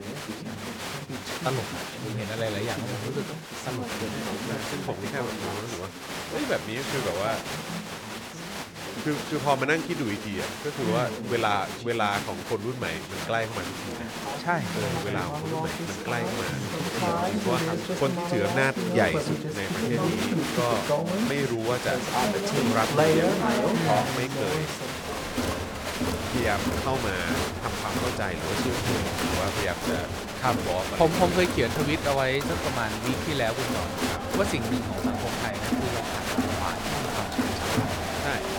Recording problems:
crowd noise; very loud; throughout; 1 dB above the speech

